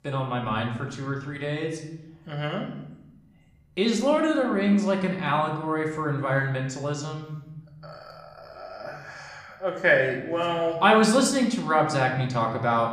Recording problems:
room echo; slight; dies away in 0.9 s
off-mic speech; somewhat distant

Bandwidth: 15.5 kHz